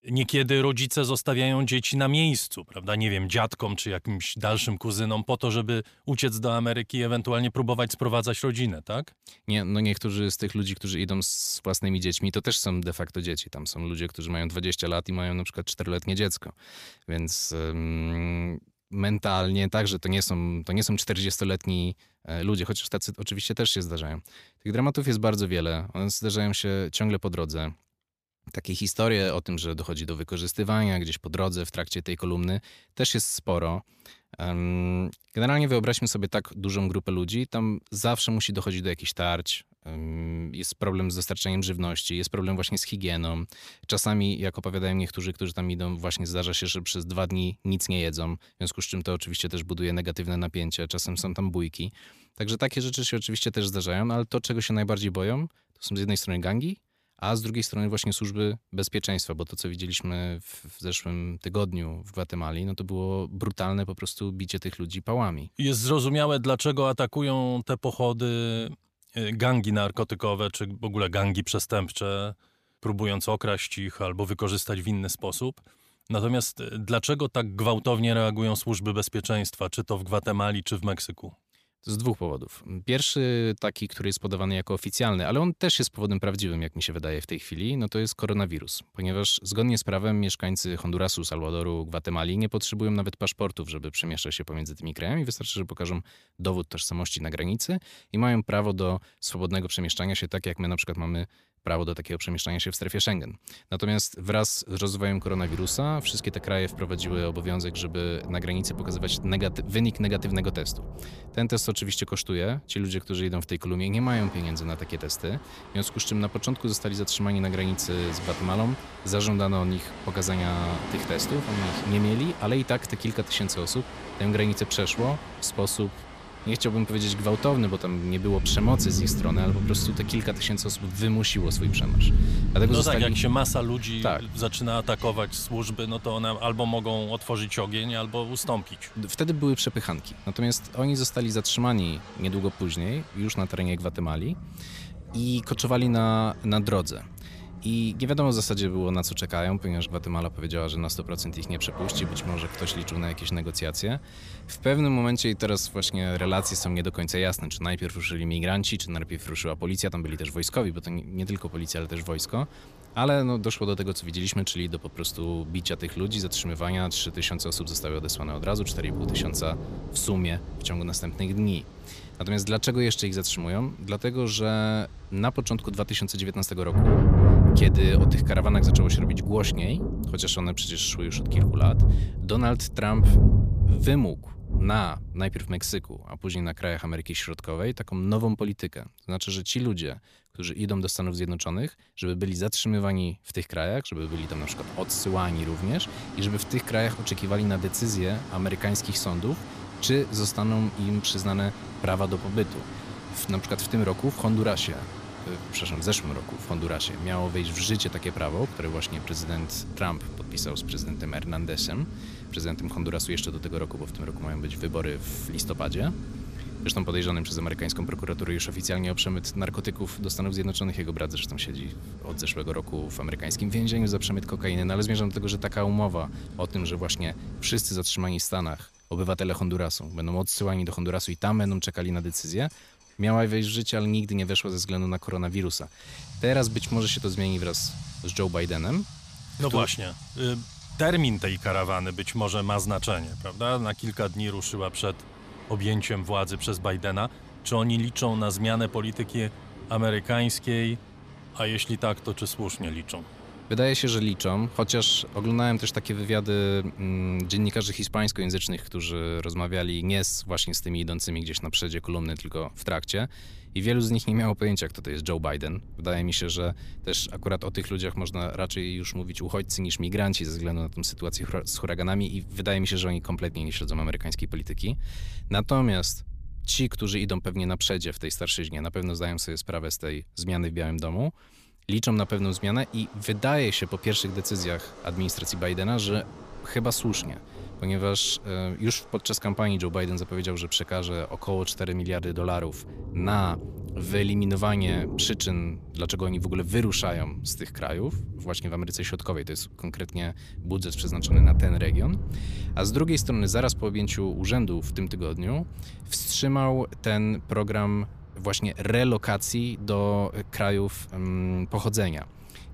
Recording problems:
rain or running water; loud; from 1:45 on; 5 dB below the speech

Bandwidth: 14.5 kHz